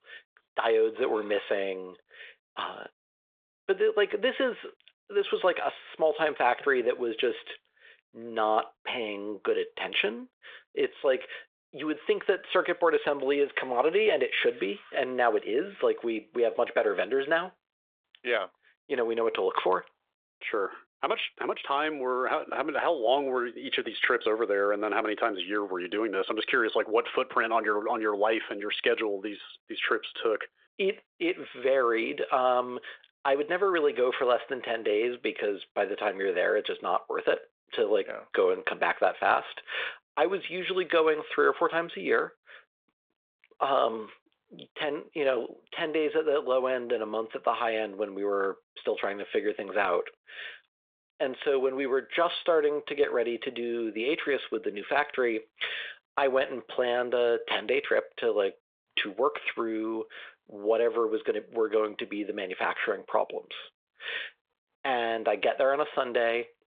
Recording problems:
phone-call audio

